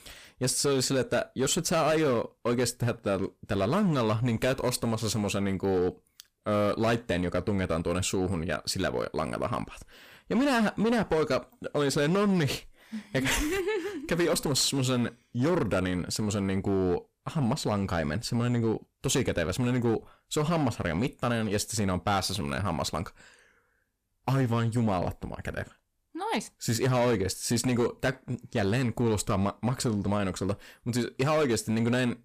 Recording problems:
distortion; slight; 9% of the sound clipped

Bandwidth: 15 kHz